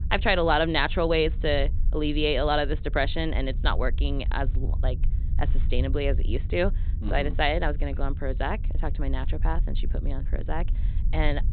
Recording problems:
high frequencies cut off; severe; nothing above 4 kHz
low rumble; faint; throughout; 20 dB below the speech

